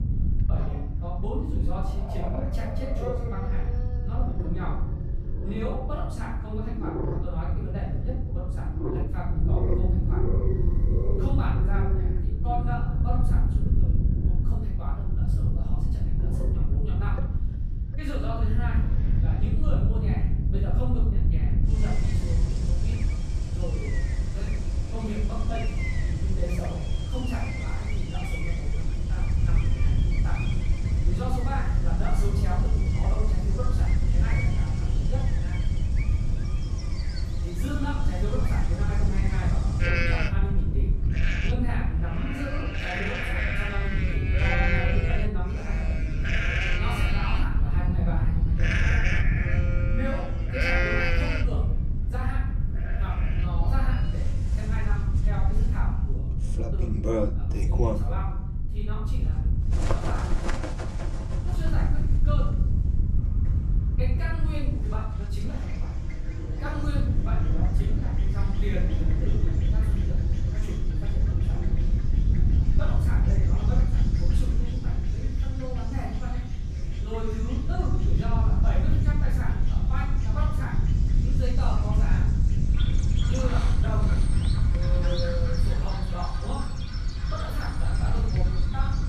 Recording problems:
off-mic speech; far
room echo; noticeable; dies away in 0.7 s
animal sounds; very loud; throughout; 1 dB above the speech
wind noise on the microphone; heavy; 4 dB below the speech
low rumble; noticeable; from 22 to 56 s; 15 dB below the speech

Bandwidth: 15 kHz